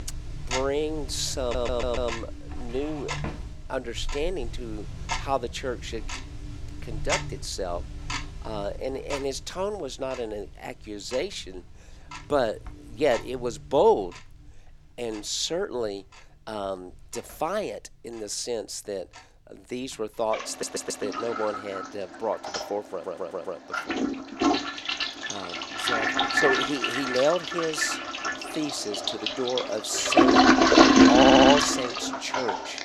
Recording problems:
household noises; very loud; throughout; 5 dB above the speech
audio stuttering; 4 times, first at 1.5 s

